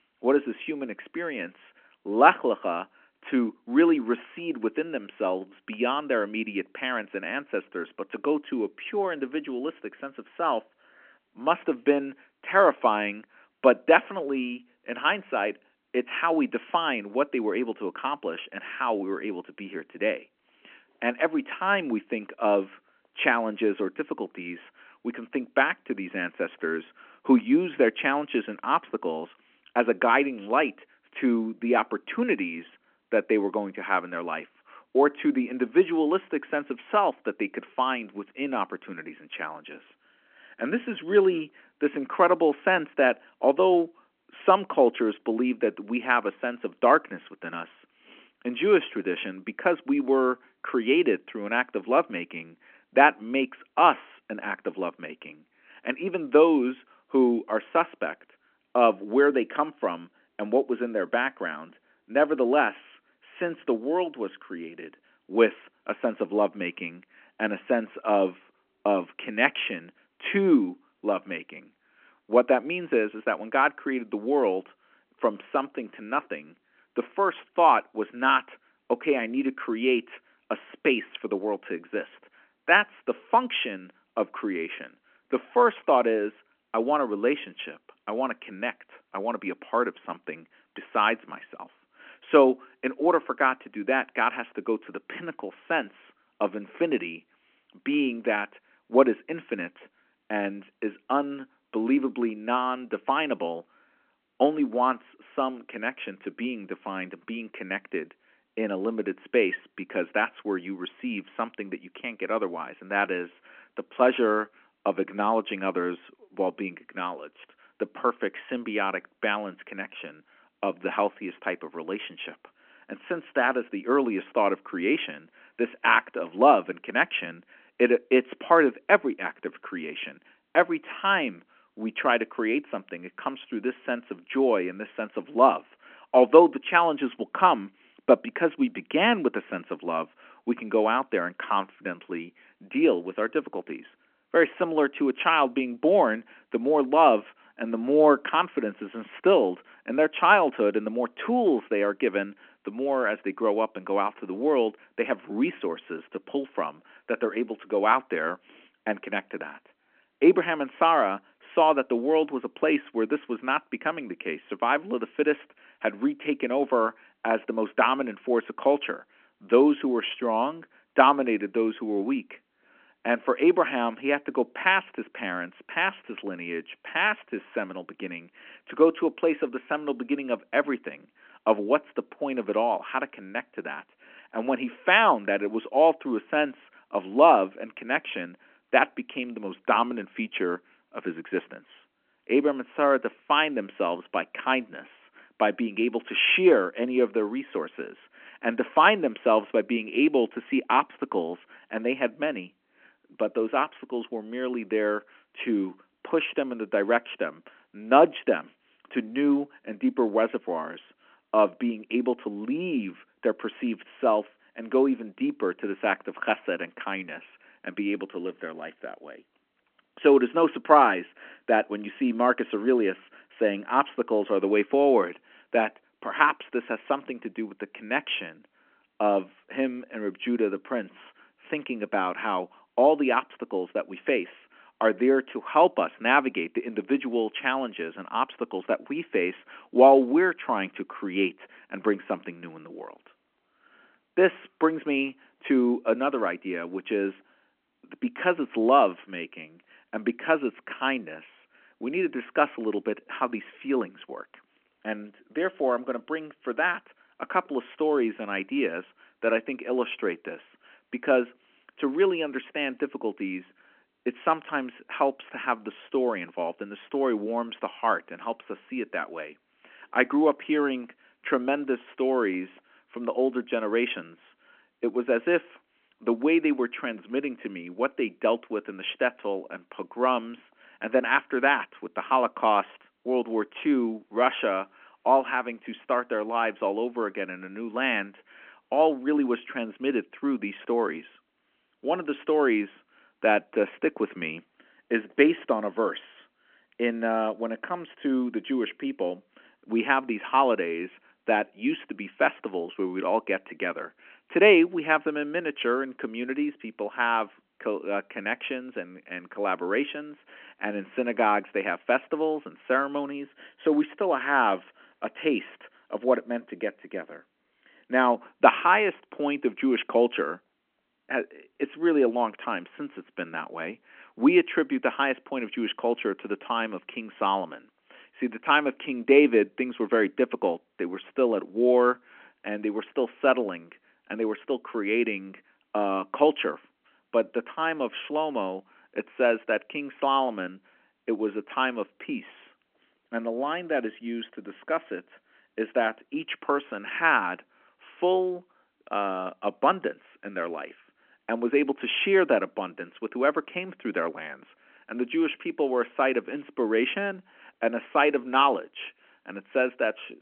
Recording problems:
phone-call audio

